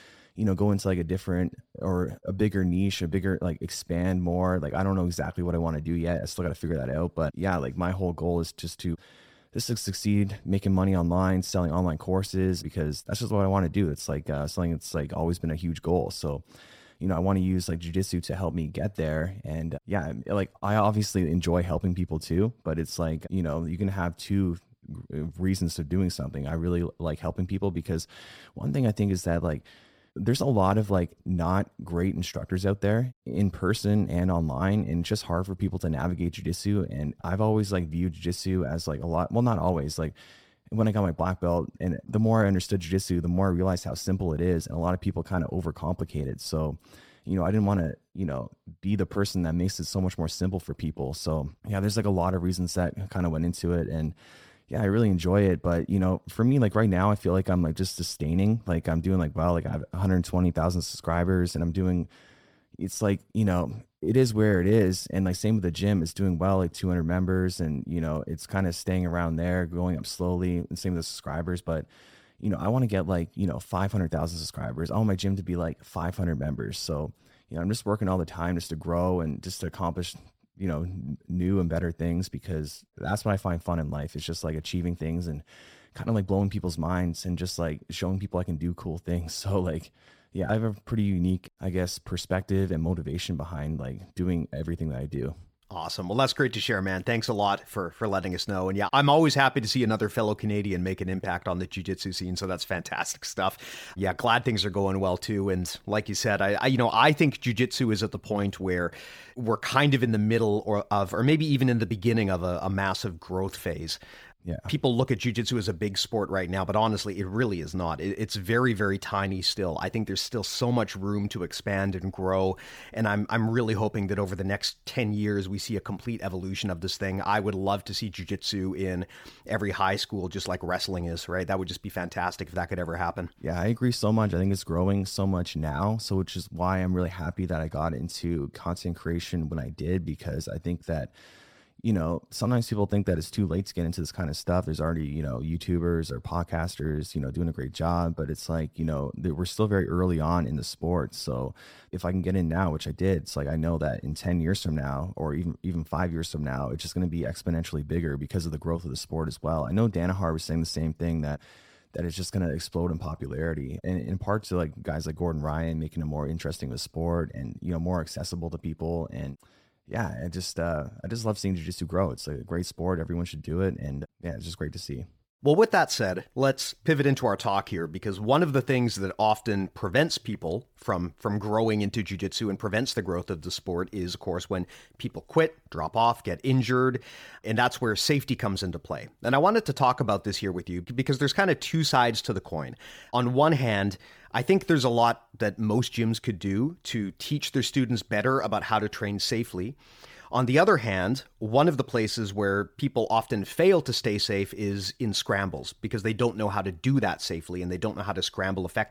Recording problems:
none

